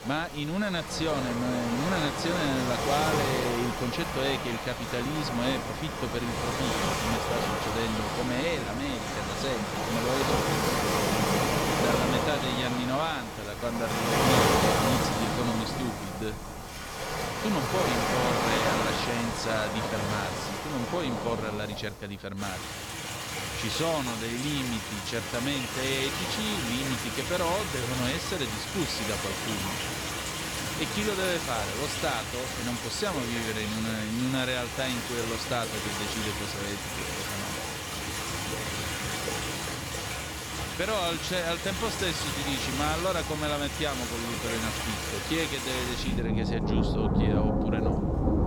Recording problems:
rain or running water; very loud; throughout; 2 dB above the speech

